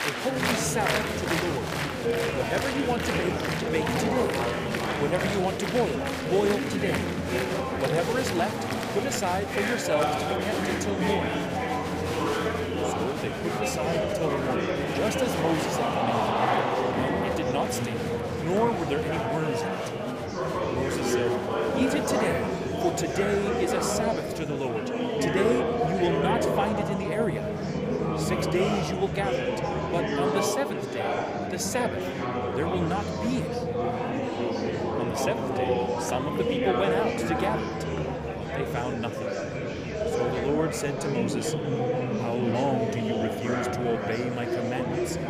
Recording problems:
murmuring crowd; very loud; throughout; 3 dB above the speech

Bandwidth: 15 kHz